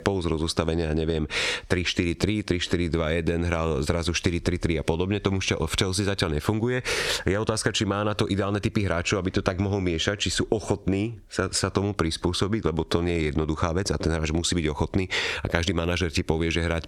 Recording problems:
squashed, flat; somewhat

